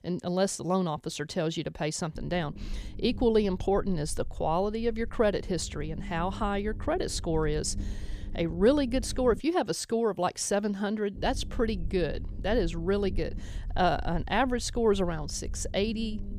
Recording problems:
low rumble; faint; from 2 to 9.5 s and from 11 s on; 25 dB below the speech

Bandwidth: 14.5 kHz